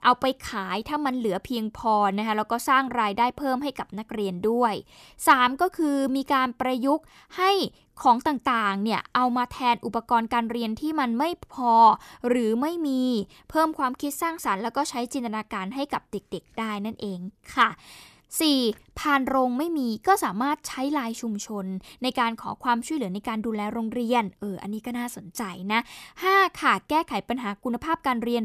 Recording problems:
abrupt cut into speech; at the end

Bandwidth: 14.5 kHz